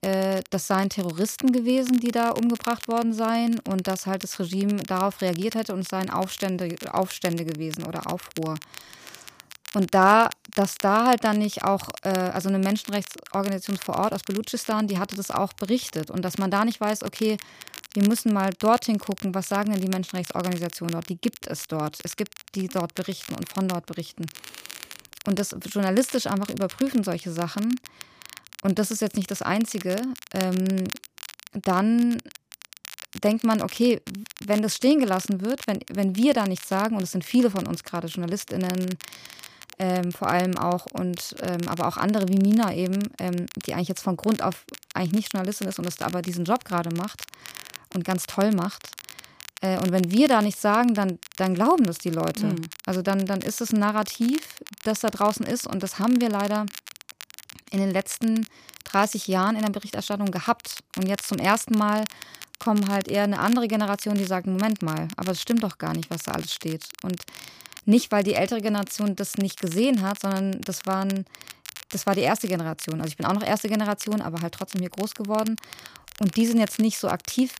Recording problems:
crackle, like an old record; noticeable; 15 dB below the speech

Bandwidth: 15 kHz